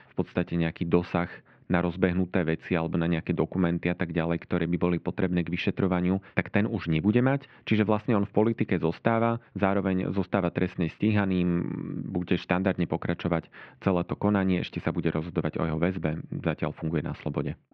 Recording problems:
muffled; very; fading above 2.5 kHz

